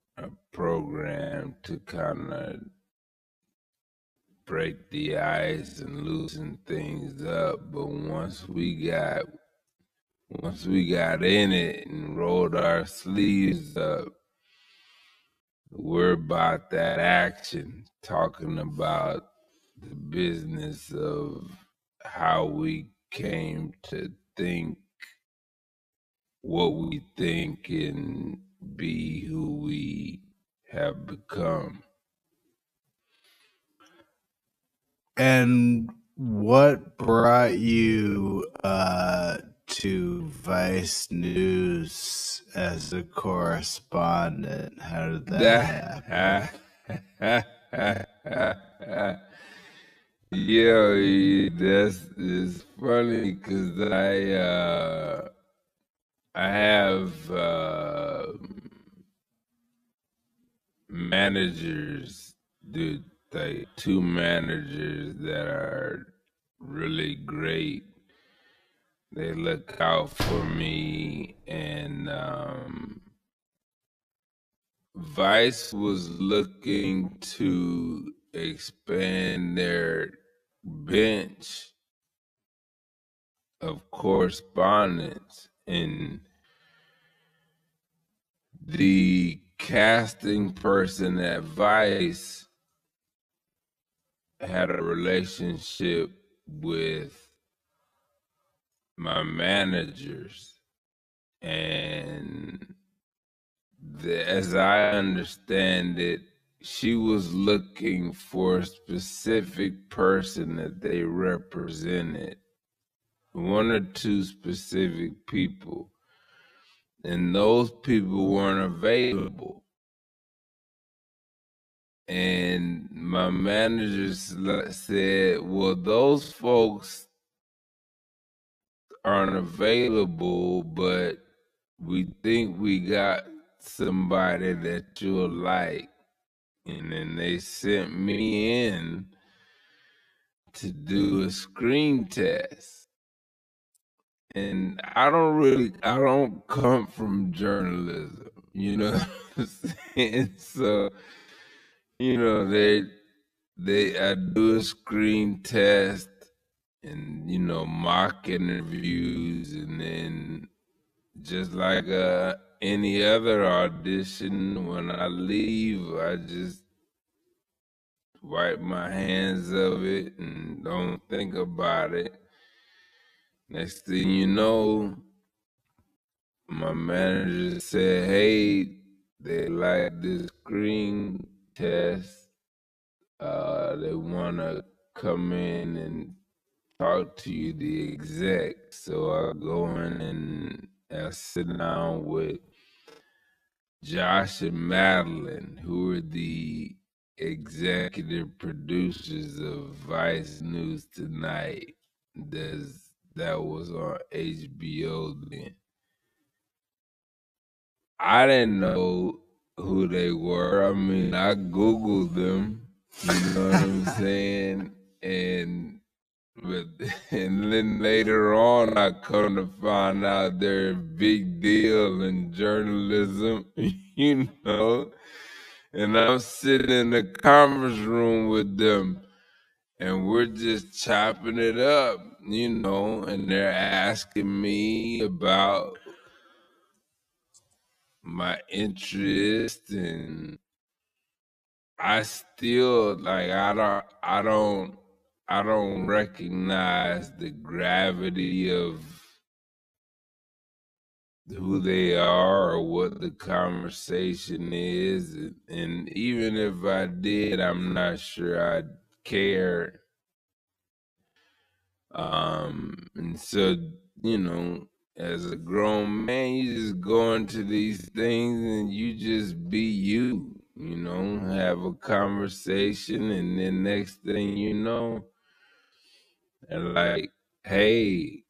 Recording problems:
wrong speed, natural pitch; too slow; 0.5 times normal speed
choppy; very; 6% of the speech affected
door banging; noticeable; at 1:10; peak 4 dB below the speech

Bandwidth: 14.5 kHz